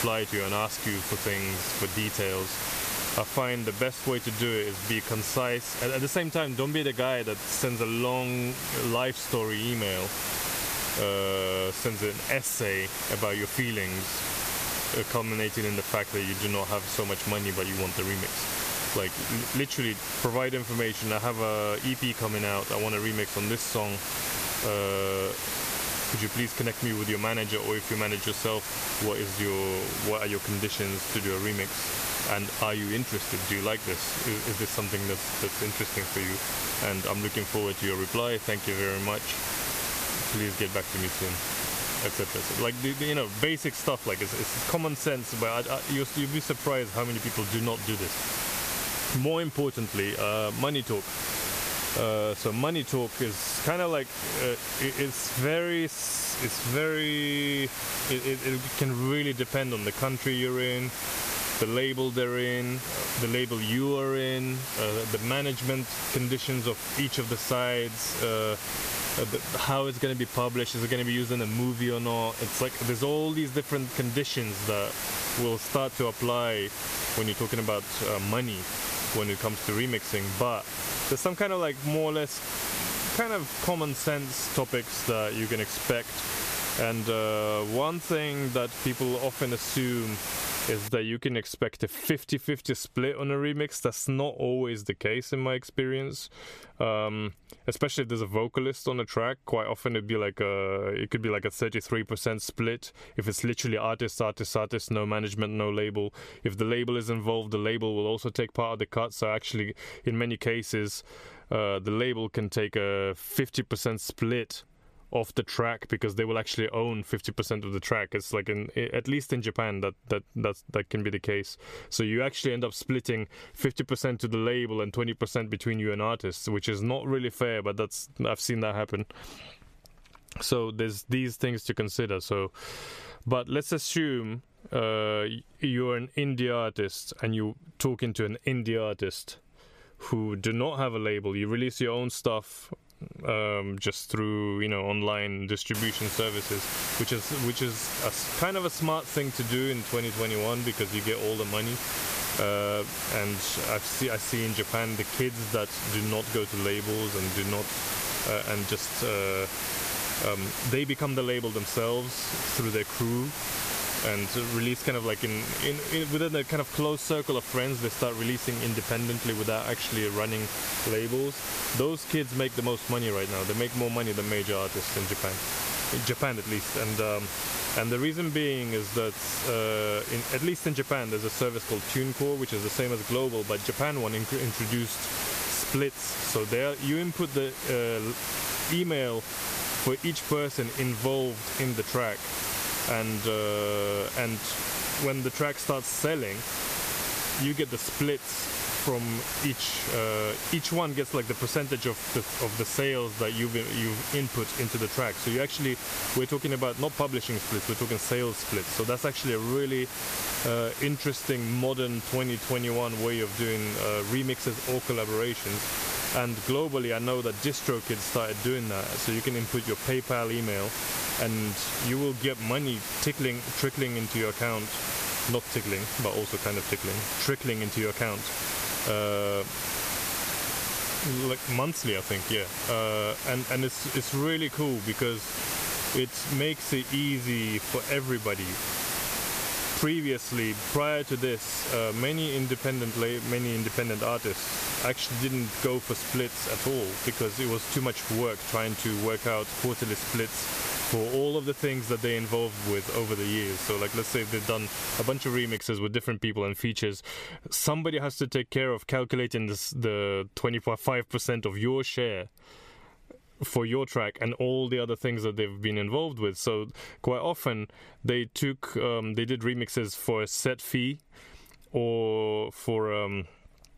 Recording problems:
squashed, flat; somewhat
hiss; loud; until 1:31 and from 2:26 to 4:16; 3 dB below the speech

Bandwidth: 14.5 kHz